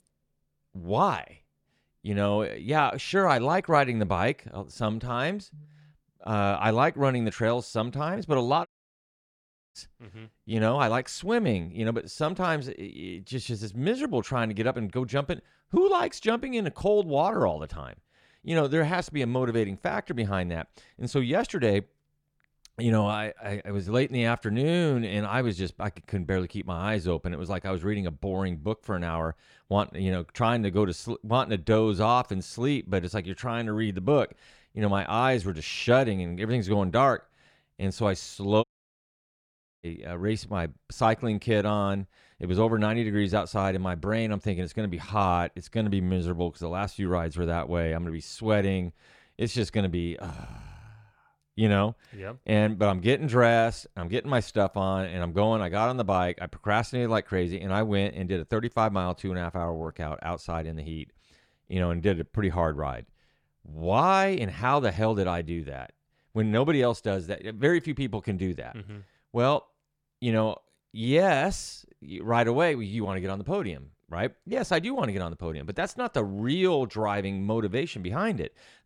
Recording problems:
audio cutting out; at 8.5 s for 1 s and at 39 s for 1 s

